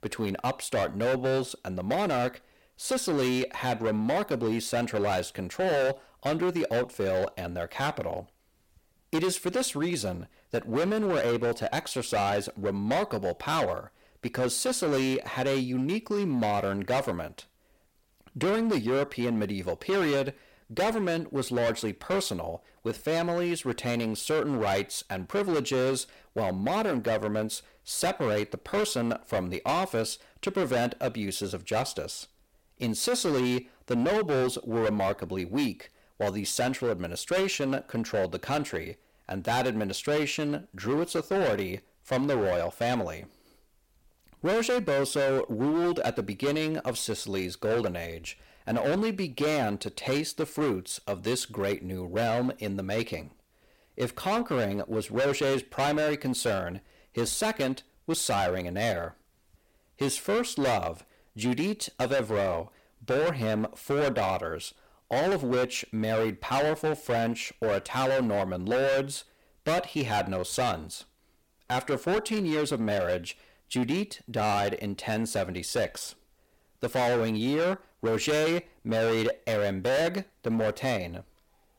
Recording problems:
distortion; heavy; 16% of the sound clipped

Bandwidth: 16.5 kHz